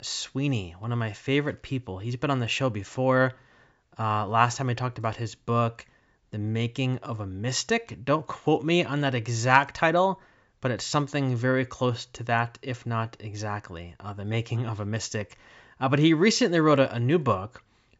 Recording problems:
high frequencies cut off; noticeable; nothing above 8 kHz

